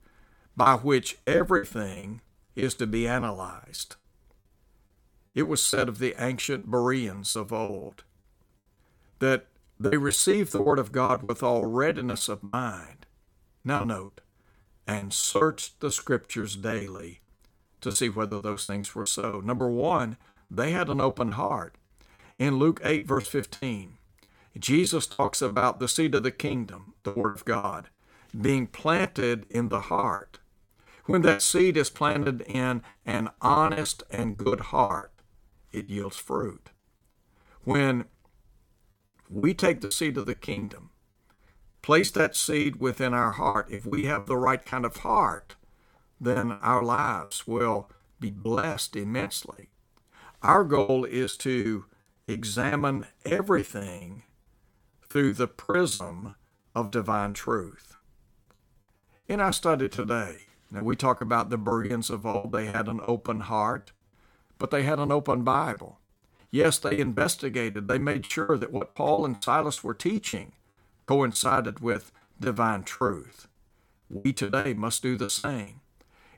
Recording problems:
choppy; very; 17% of the speech affected

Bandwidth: 17.5 kHz